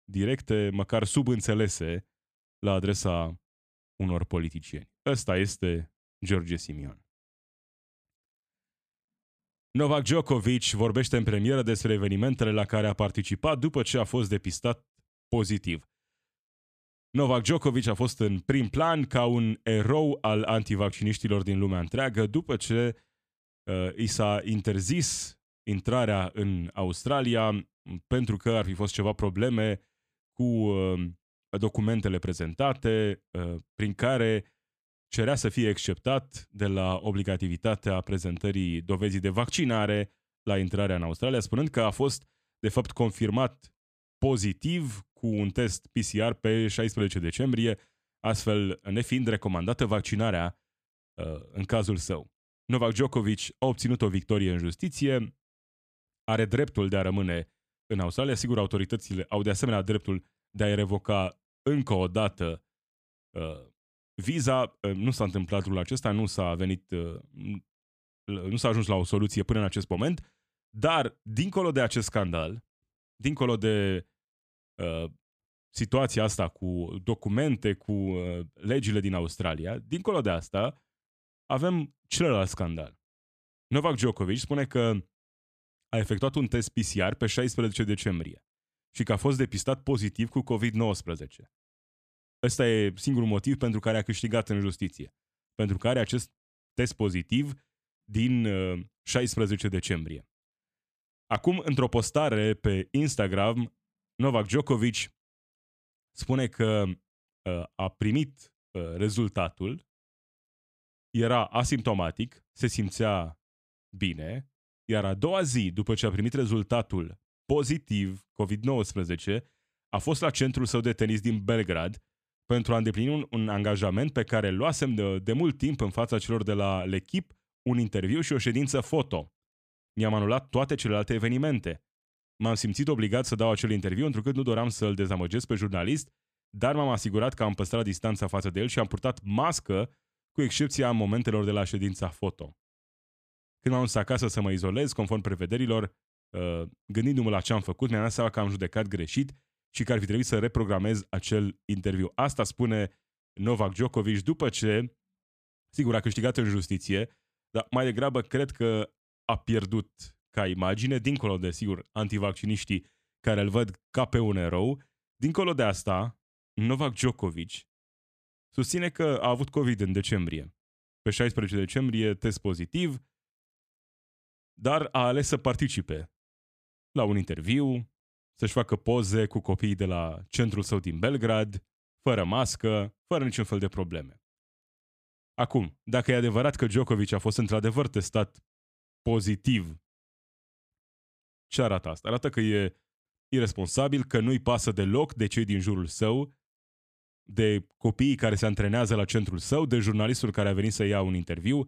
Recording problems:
none

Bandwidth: 14.5 kHz